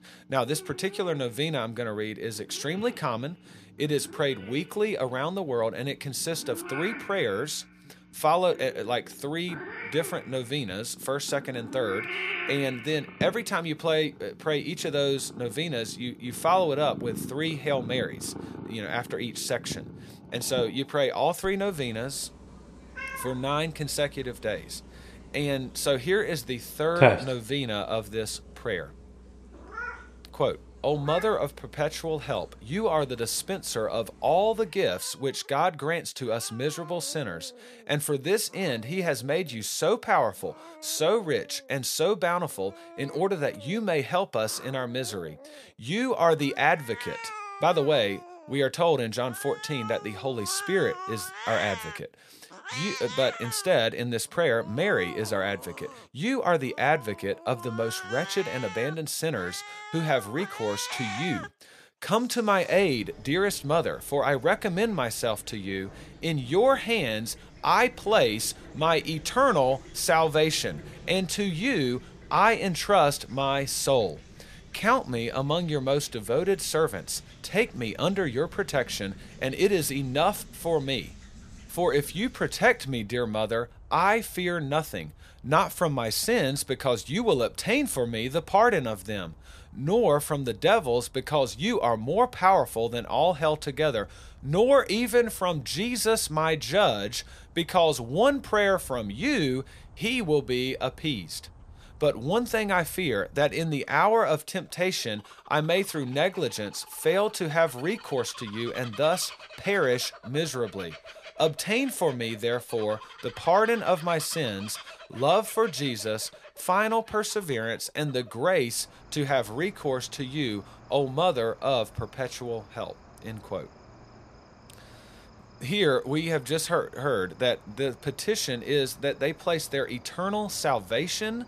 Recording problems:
animal sounds; noticeable; throughout; 15 dB below the speech

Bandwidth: 15 kHz